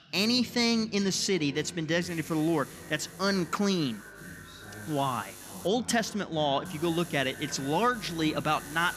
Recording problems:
echo of what is said; faint; throughout; 430 ms later, 20 dB below the speech
voice in the background; noticeable; throughout; 20 dB below the speech
electrical hum; faint; from 2 to 5.5 s and from 6.5 s on; 50 Hz, 20 dB below the speech

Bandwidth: 14.5 kHz